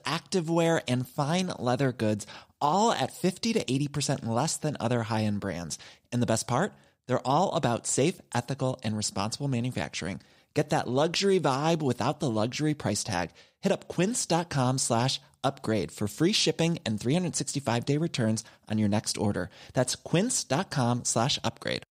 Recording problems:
none

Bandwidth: 15.5 kHz